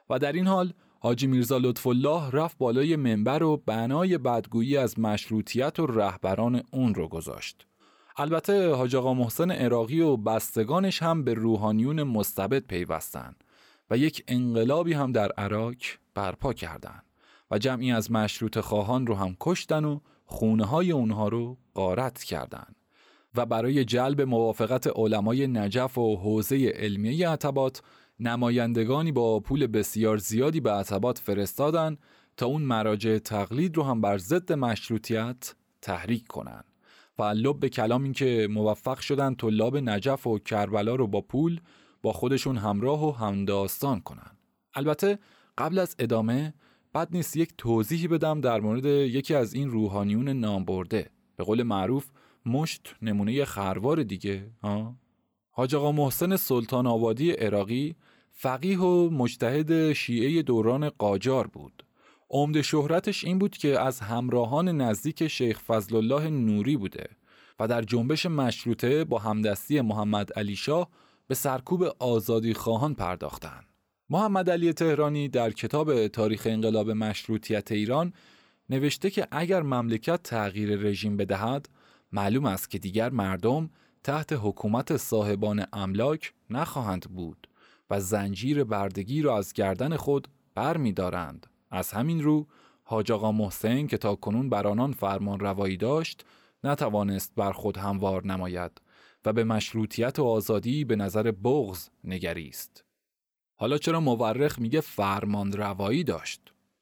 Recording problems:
none

